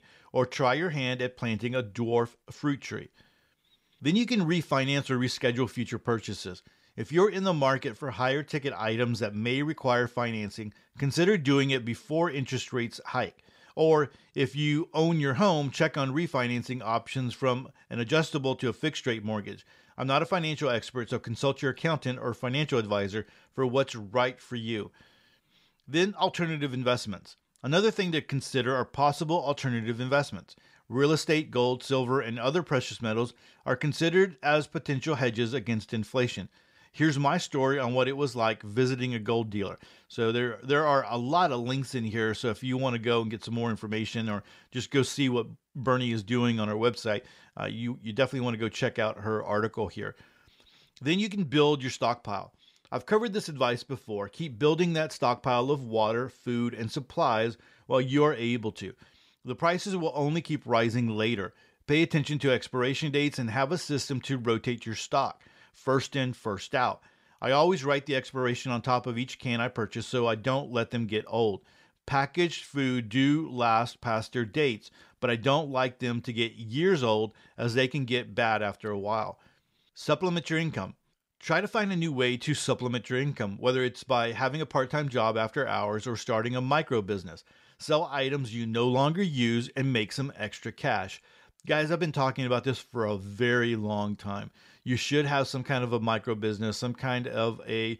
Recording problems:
none

